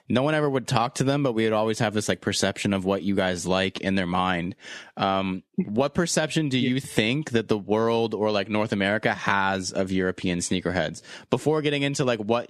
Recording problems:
squashed, flat; somewhat

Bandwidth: 13.5 kHz